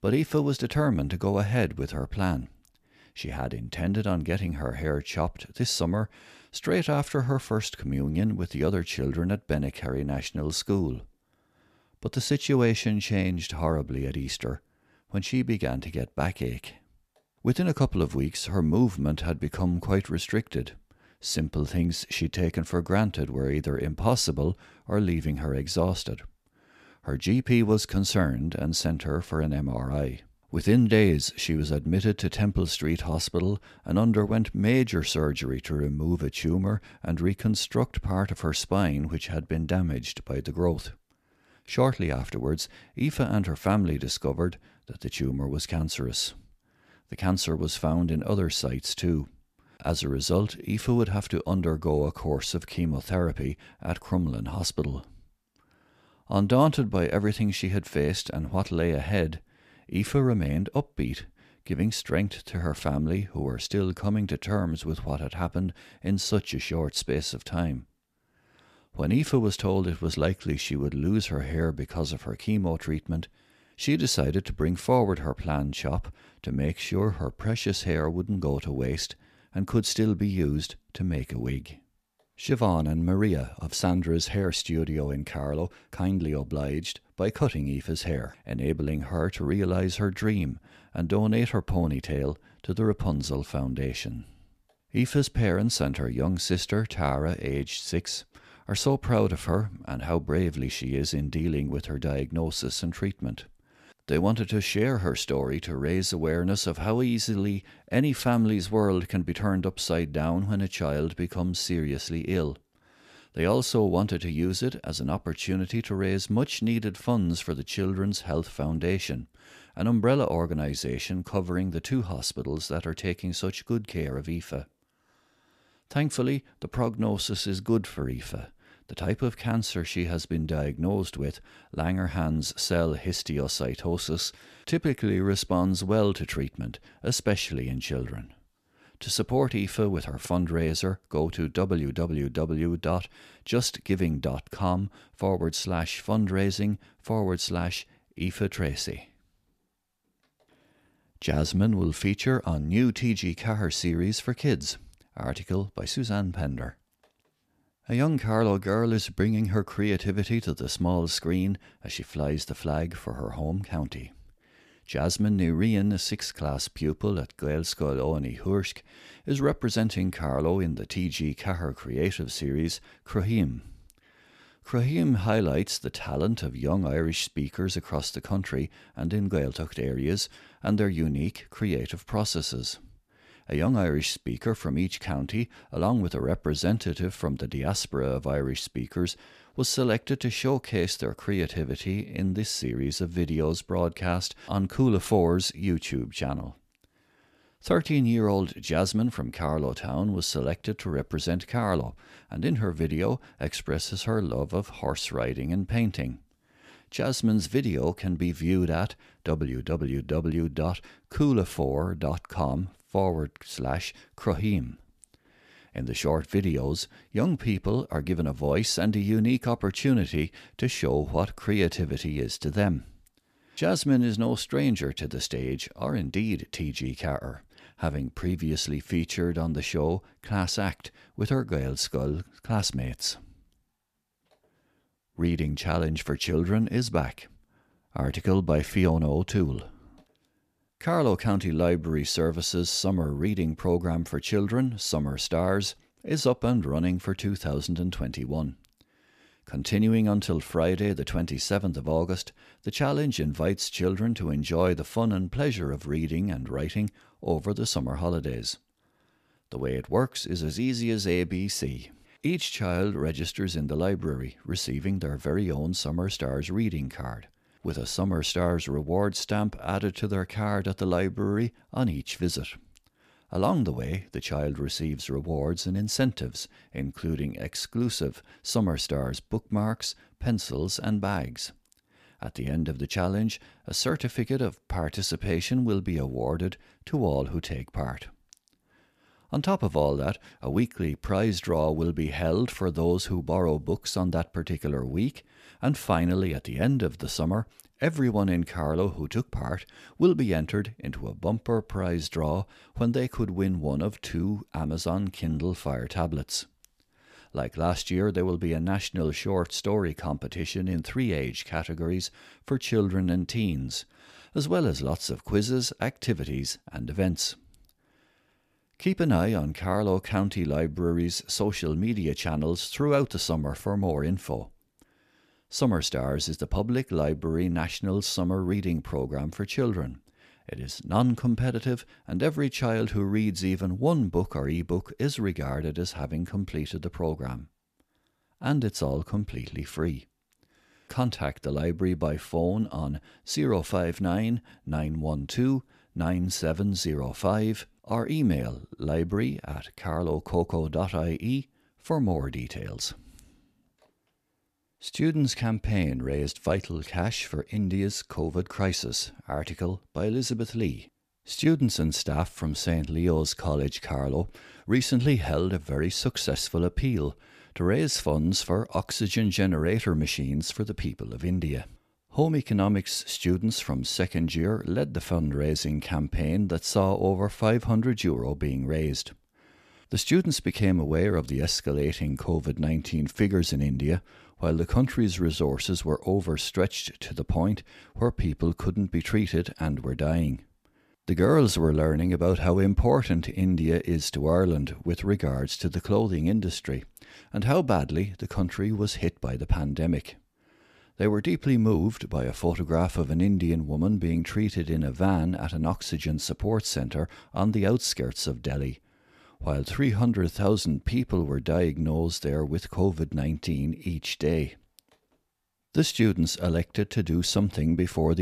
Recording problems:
abrupt cut into speech; at the end

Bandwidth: 14.5 kHz